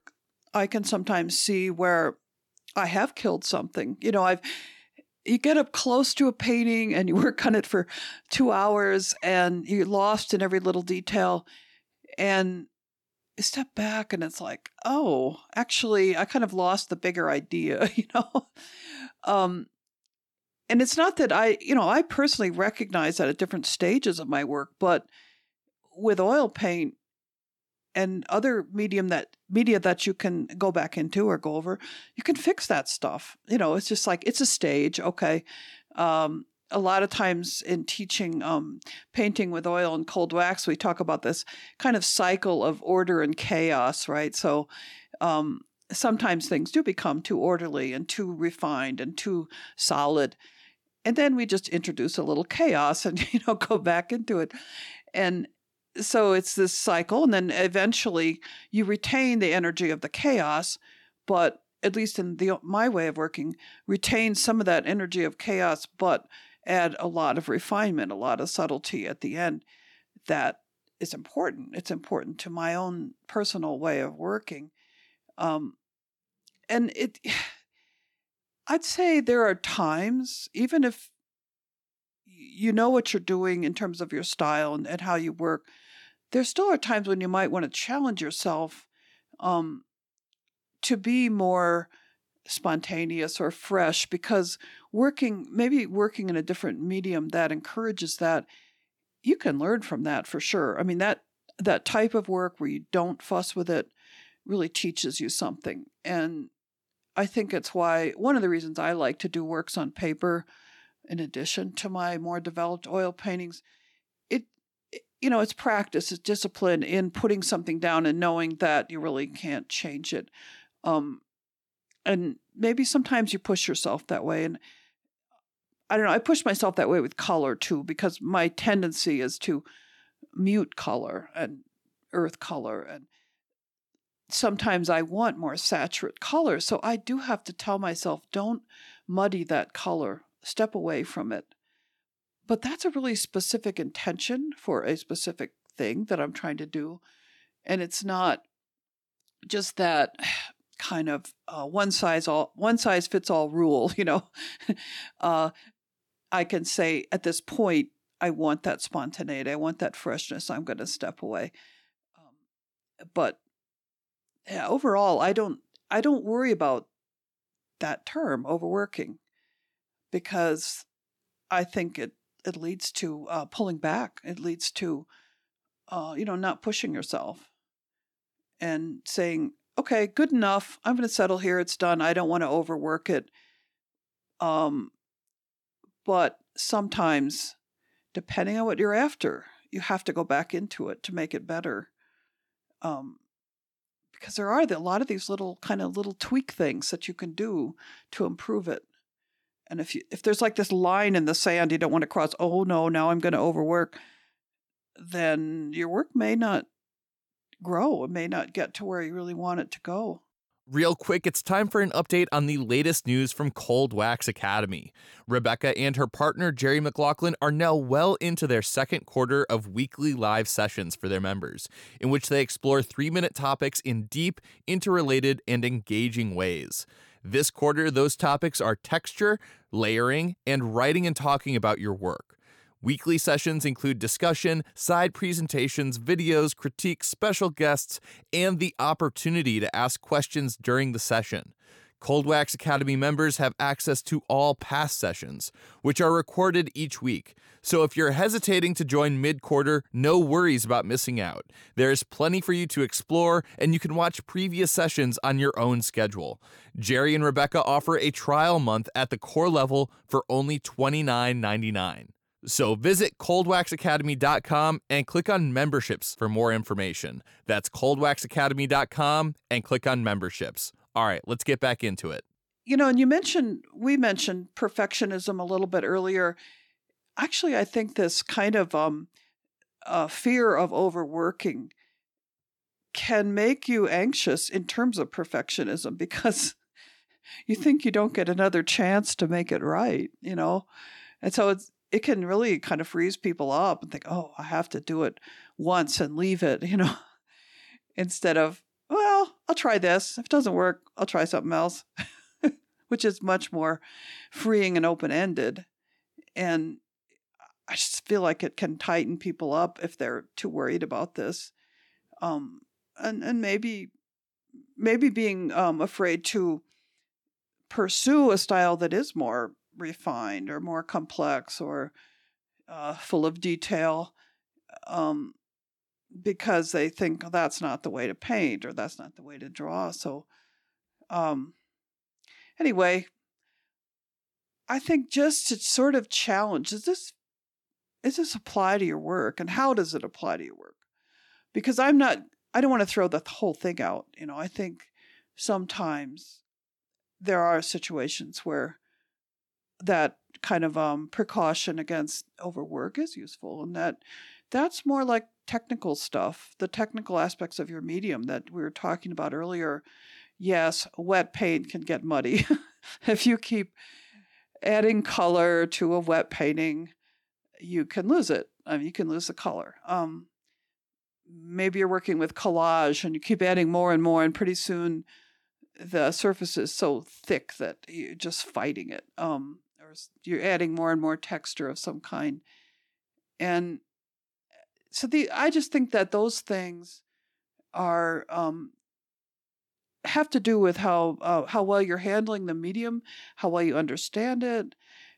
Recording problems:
none

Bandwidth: 18 kHz